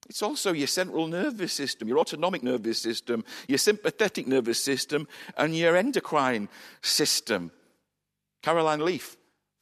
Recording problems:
uneven, jittery; strongly; from 1 to 9 s

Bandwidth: 14 kHz